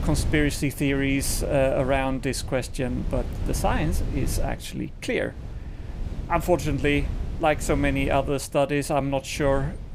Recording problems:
wind noise on the microphone; occasional gusts; 20 dB below the speech

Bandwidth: 15.5 kHz